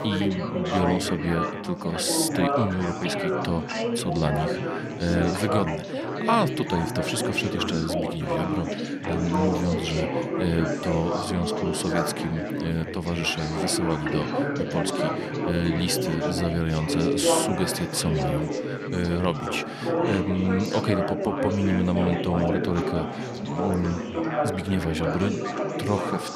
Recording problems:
chatter from many people; loud; throughout; 1 dB below the speech

